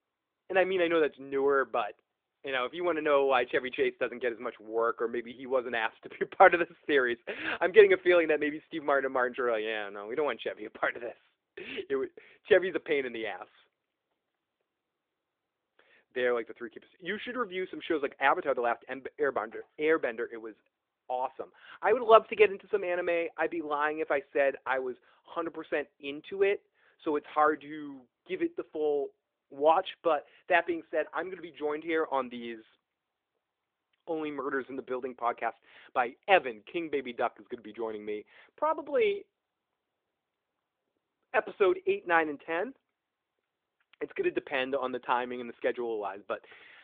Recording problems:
phone-call audio

